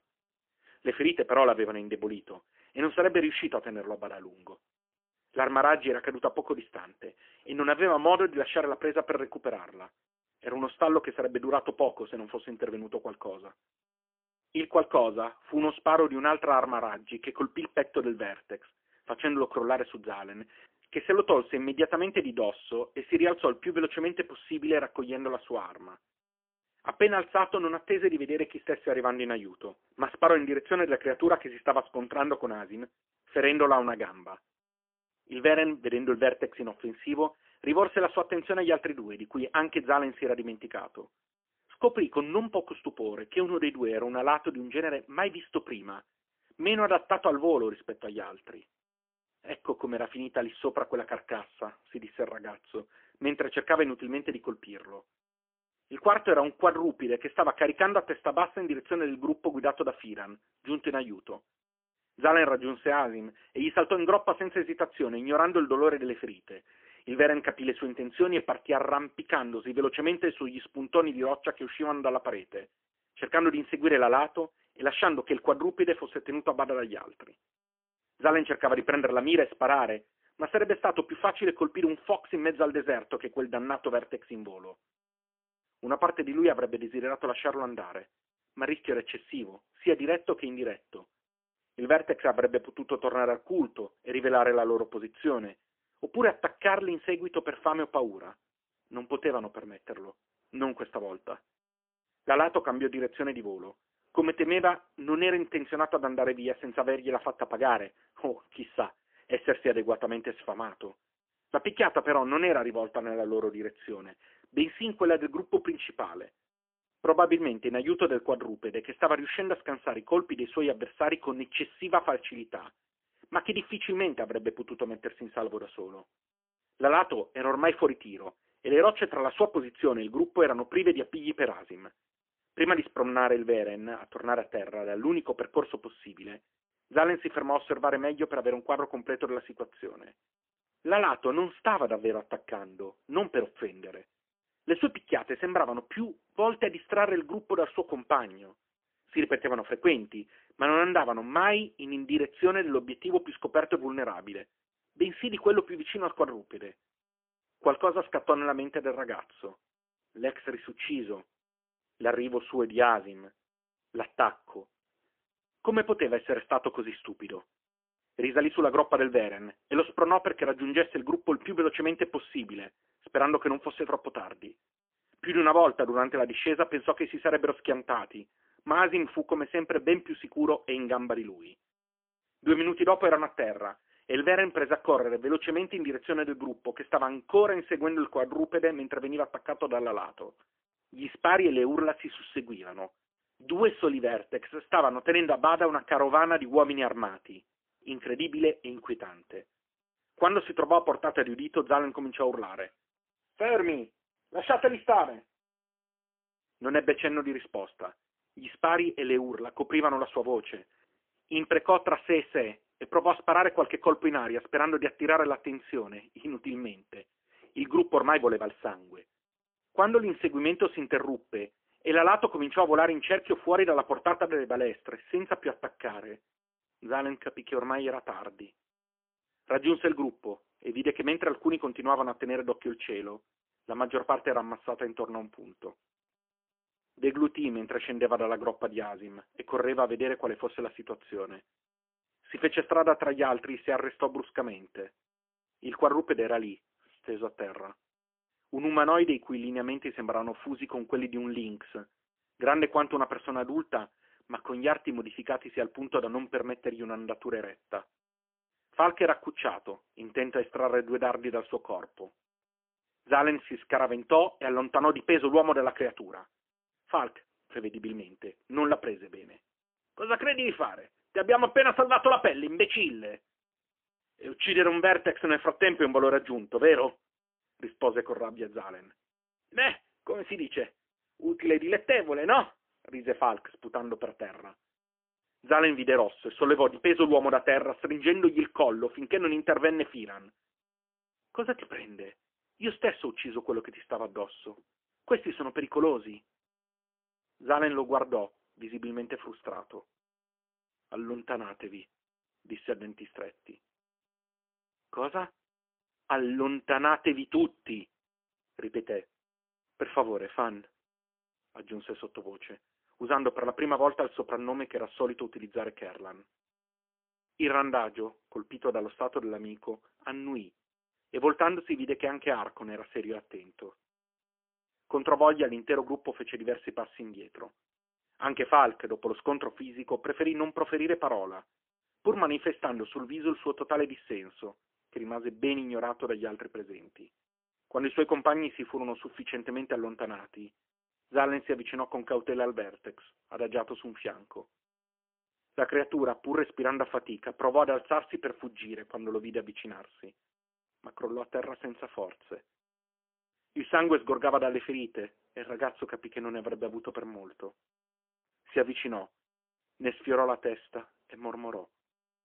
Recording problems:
phone-call audio; poor line; nothing above 3 kHz

